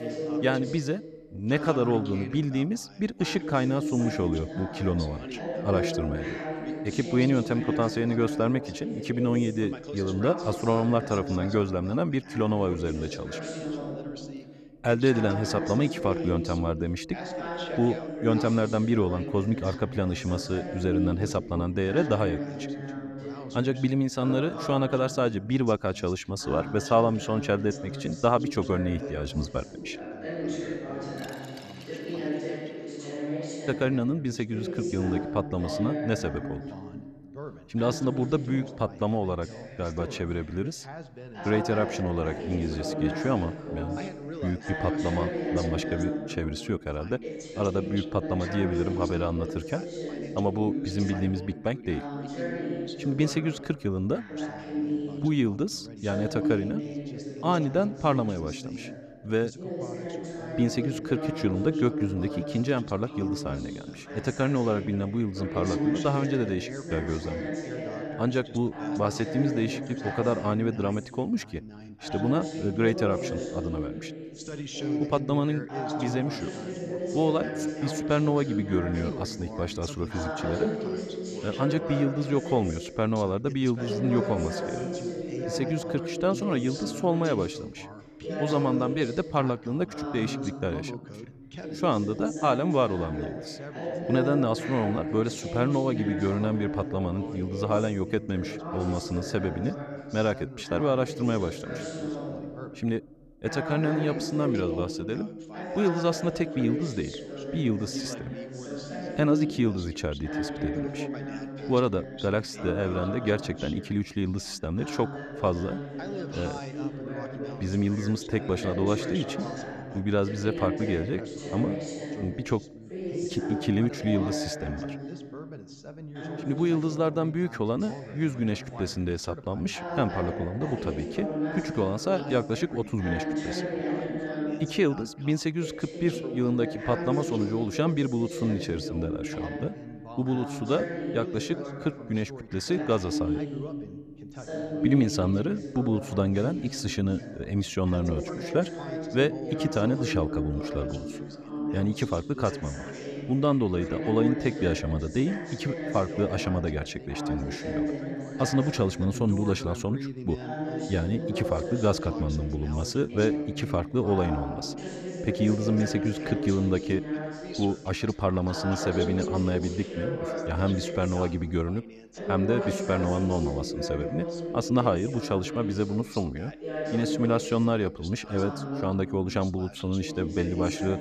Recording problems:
background chatter; loud; throughout; 2 voices, 6 dB below the speech

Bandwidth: 14.5 kHz